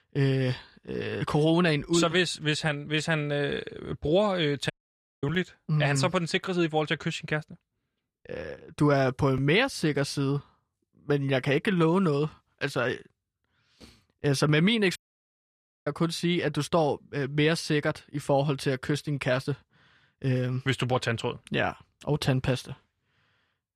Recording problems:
audio cutting out; at 4.5 s for 0.5 s and at 15 s for 1 s

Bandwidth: 14 kHz